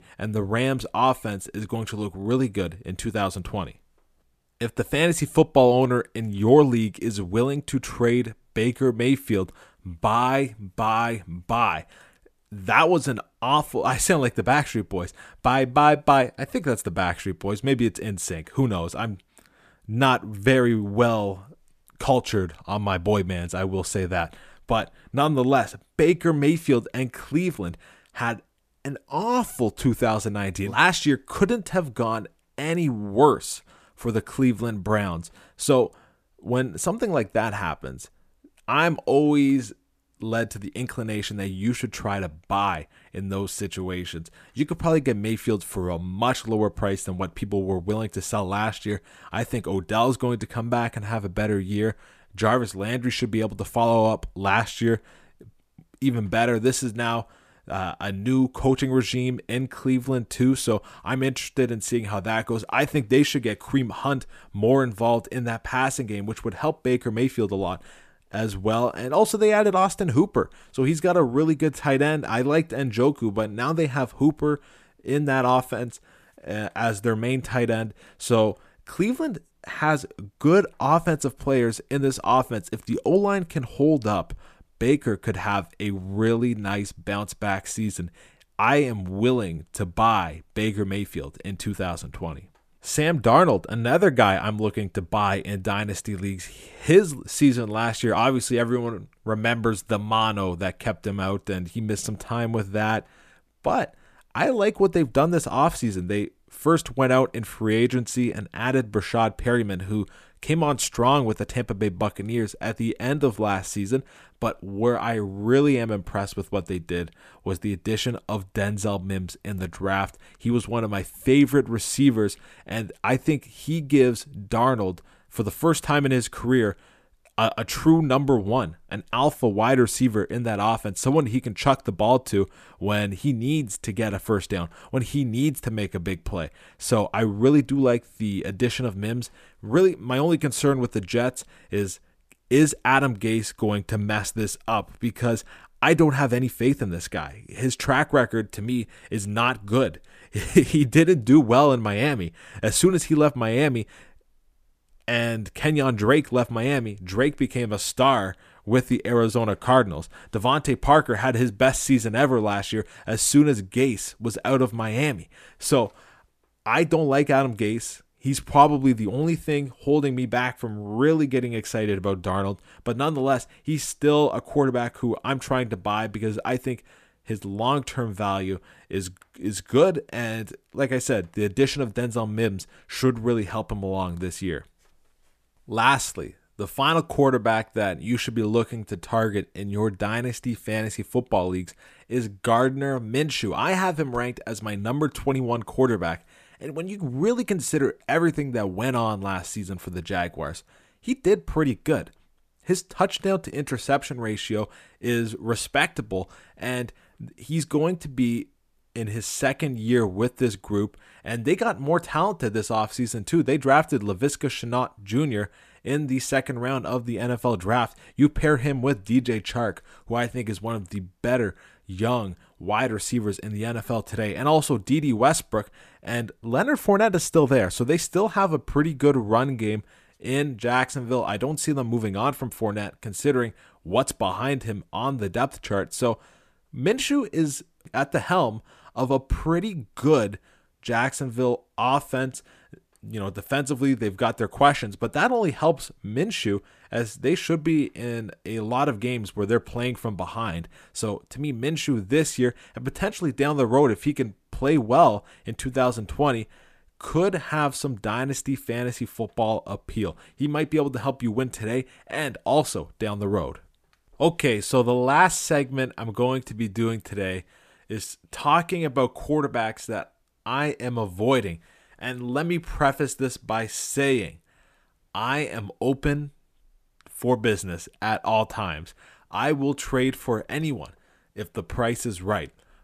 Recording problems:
none

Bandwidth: 14.5 kHz